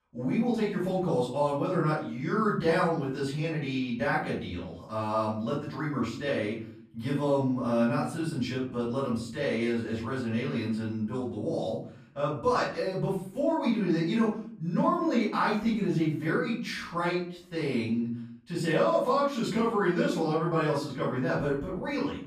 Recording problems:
off-mic speech; far
room echo; noticeable; dies away in 0.5 s

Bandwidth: 14.5 kHz